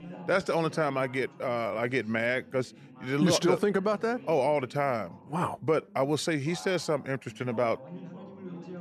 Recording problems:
background chatter; noticeable; throughout; 2 voices, 20 dB below the speech

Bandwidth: 13.5 kHz